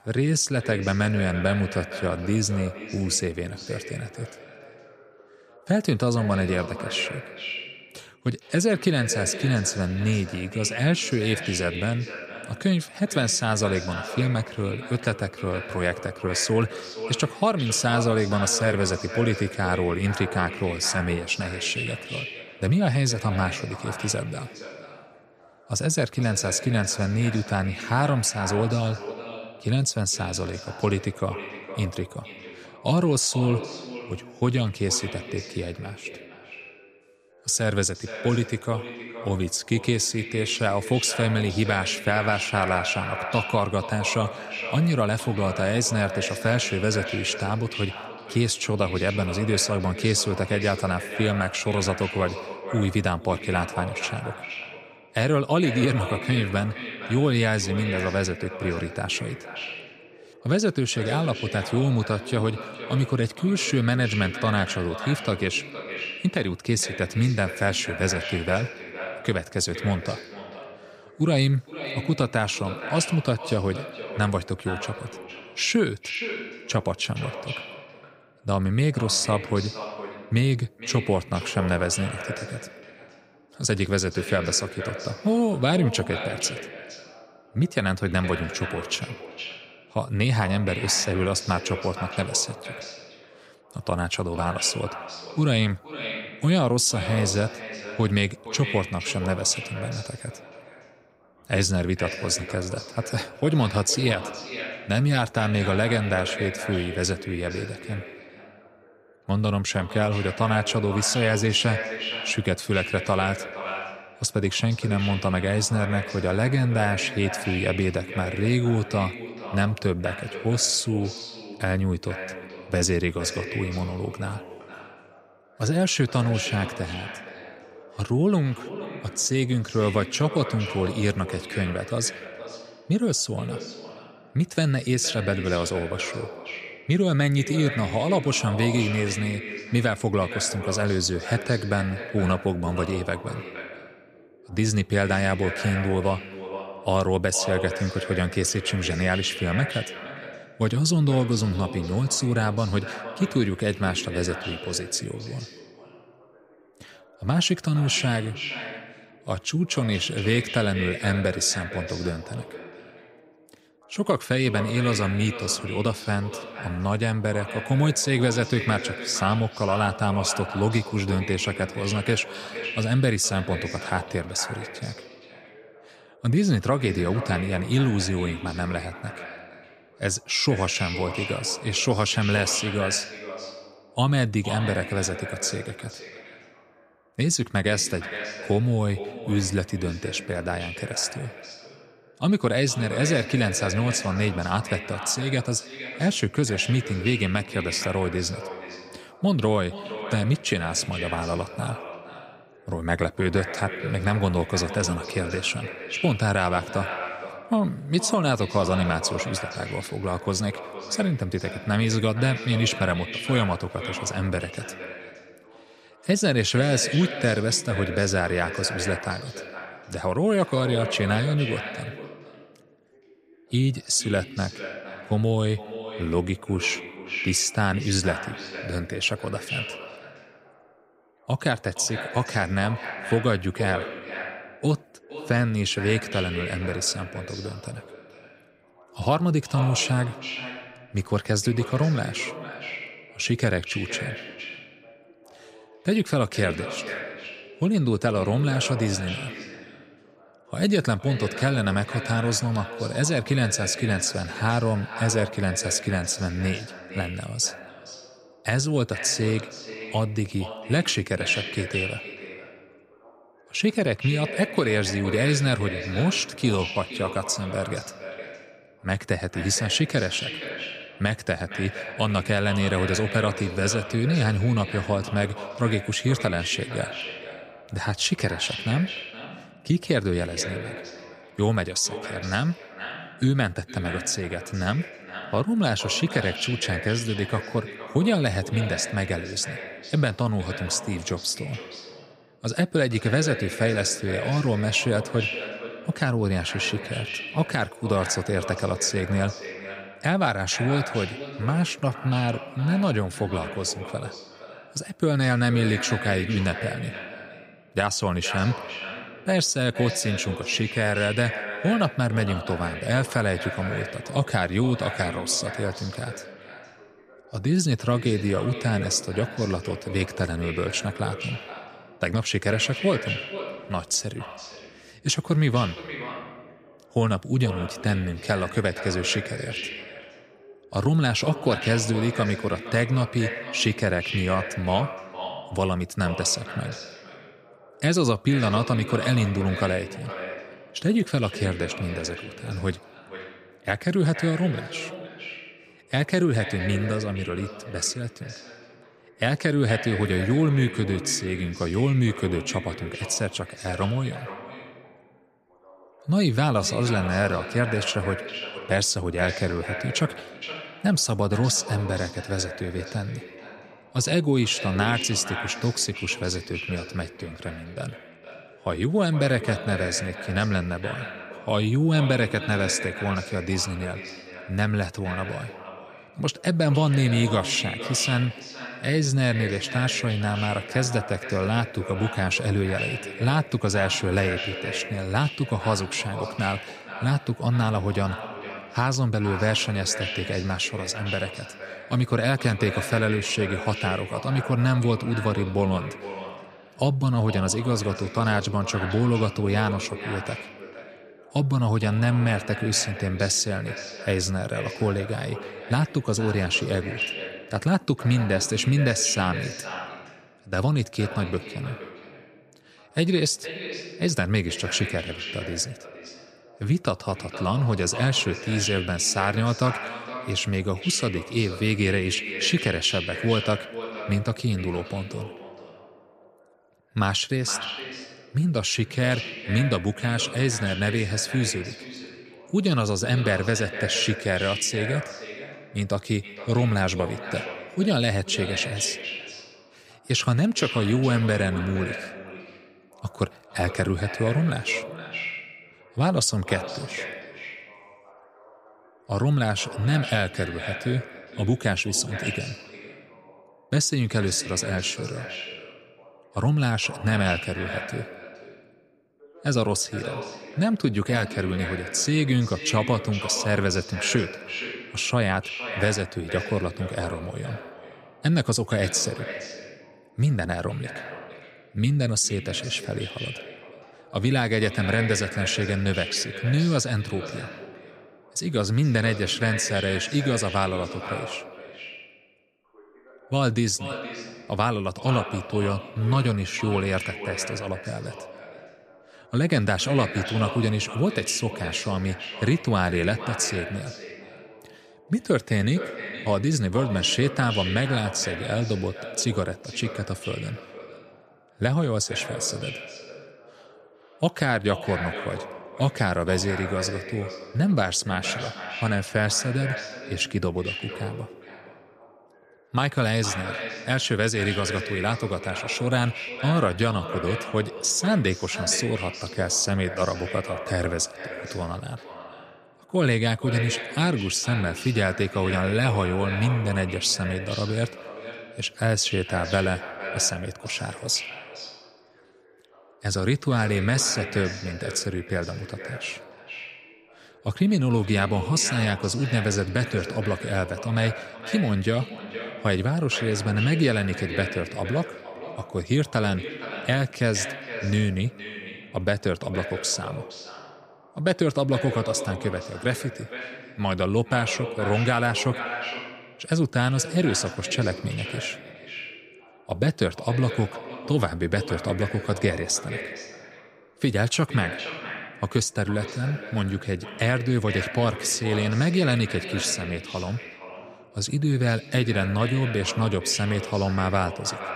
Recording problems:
echo of what is said; strong; throughout; 460 ms later, 10 dB below the speech
voice in the background; faint; throughout; 30 dB below the speech

